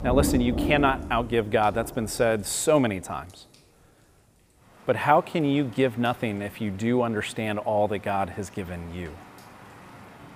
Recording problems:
rain or running water; loud; throughout; 10 dB below the speech

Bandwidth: 15 kHz